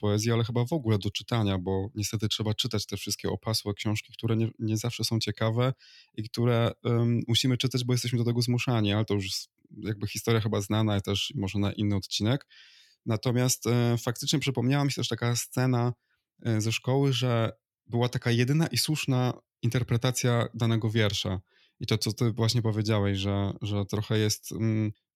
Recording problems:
none

